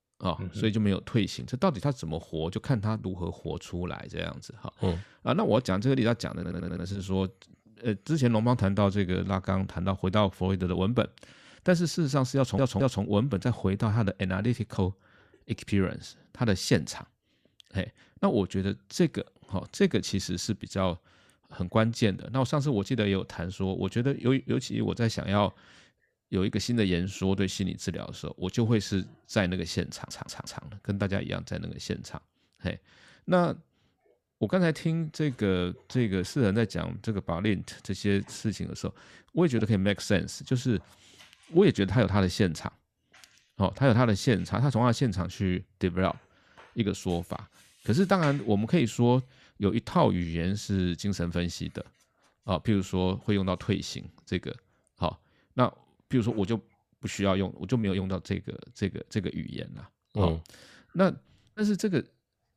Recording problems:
audio stuttering; at 6.5 s, at 12 s and at 30 s

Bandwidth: 14.5 kHz